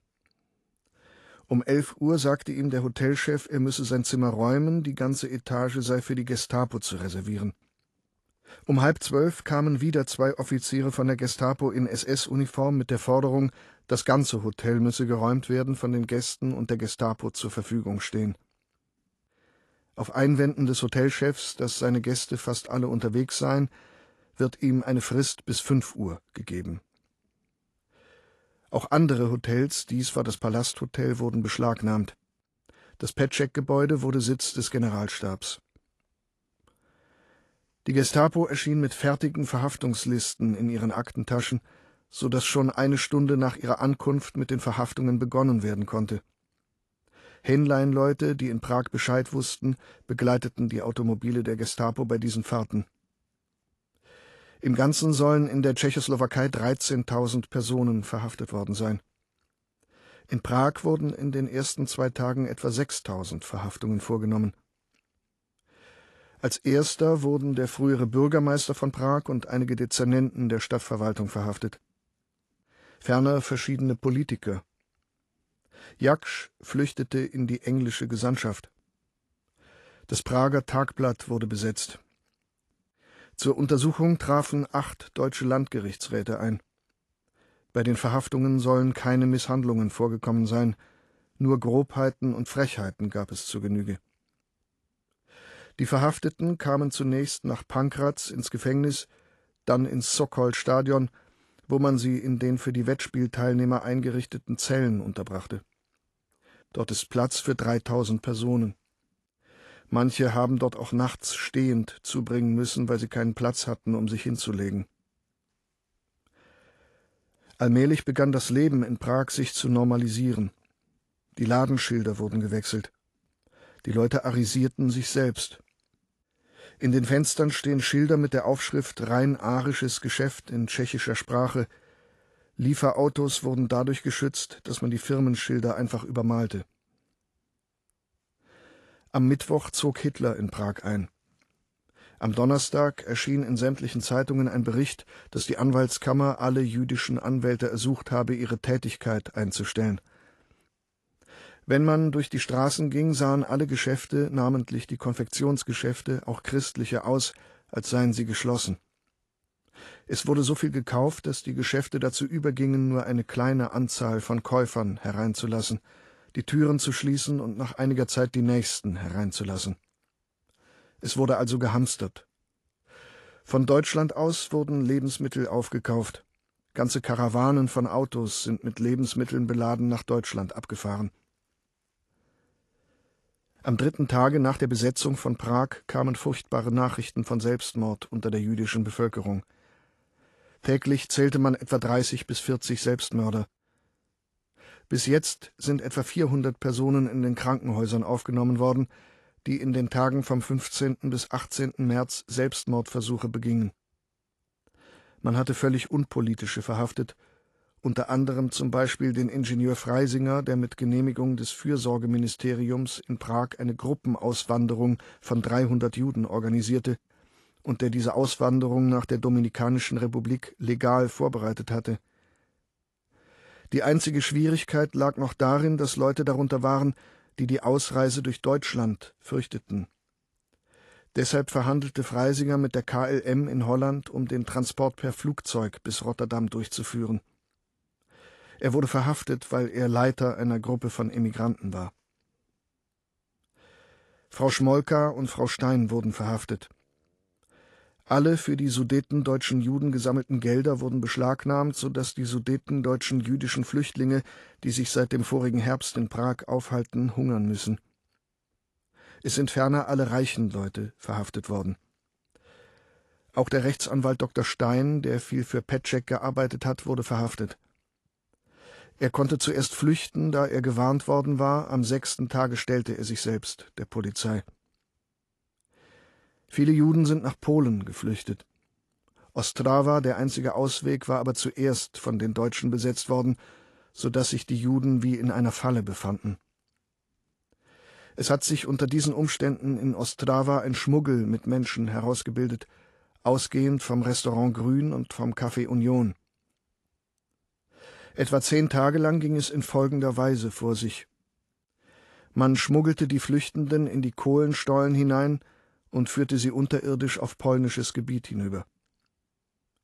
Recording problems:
garbled, watery; slightly; nothing above 11 kHz

